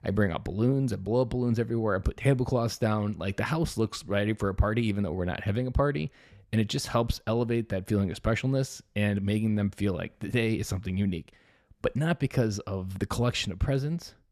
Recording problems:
none

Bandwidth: 14 kHz